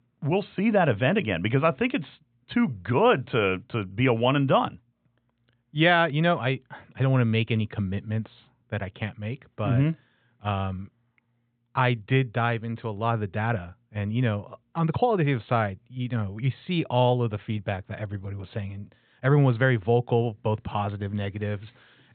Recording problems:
high frequencies cut off; severe; nothing above 4 kHz

